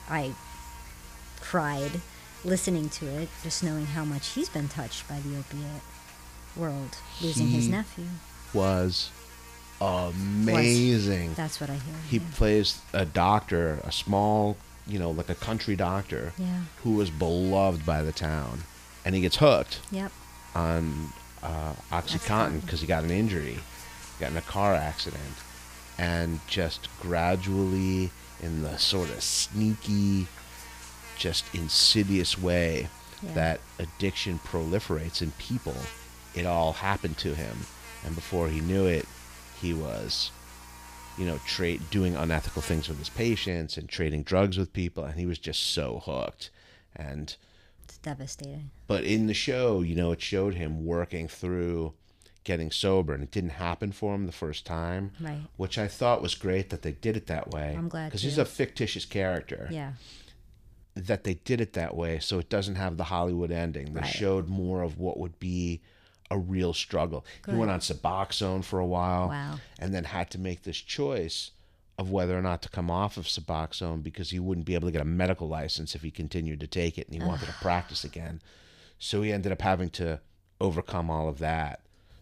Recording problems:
electrical hum; noticeable; until 43 s; 60 Hz, 15 dB below the speech

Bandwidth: 15 kHz